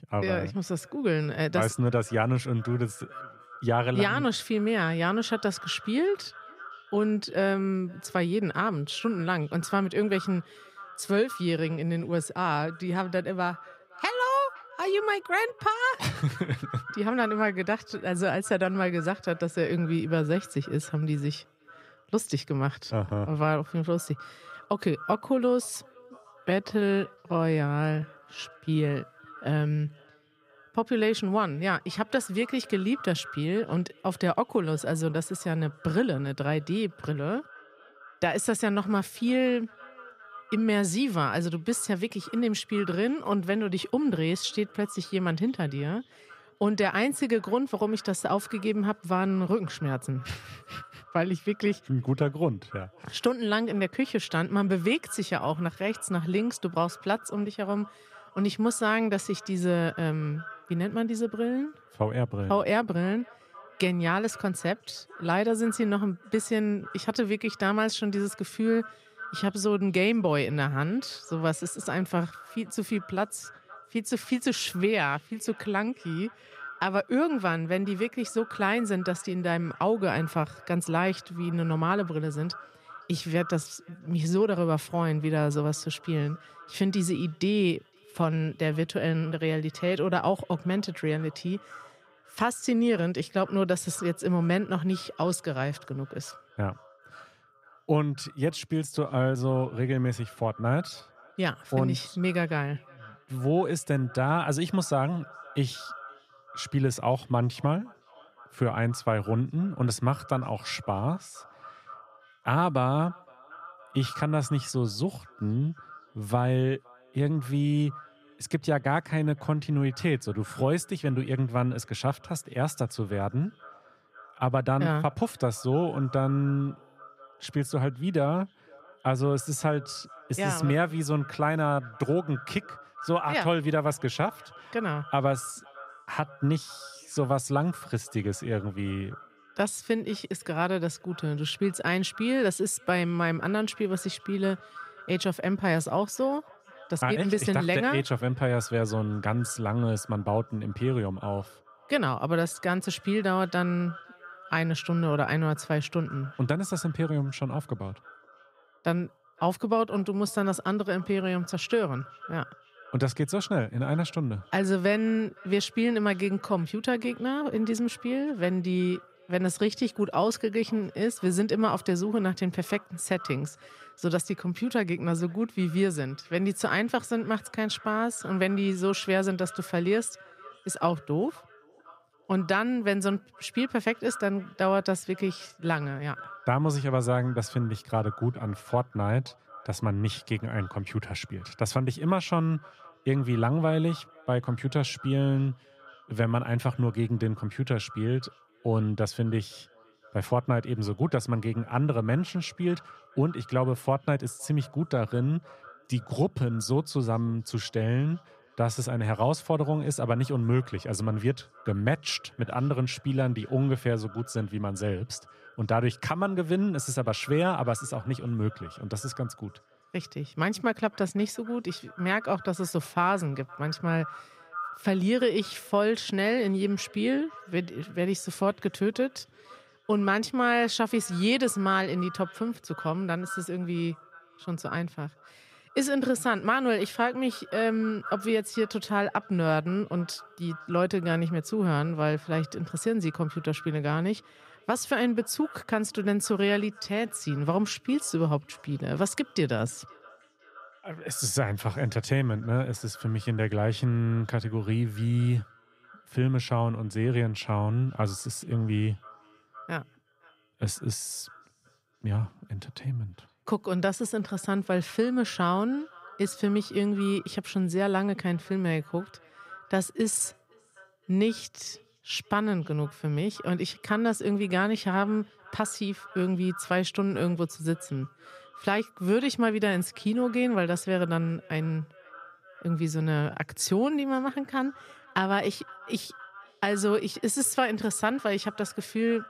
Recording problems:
echo of what is said; faint; throughout; 510 ms later, 20 dB below the speech

